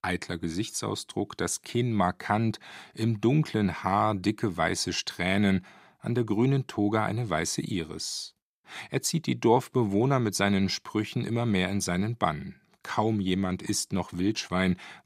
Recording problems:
none

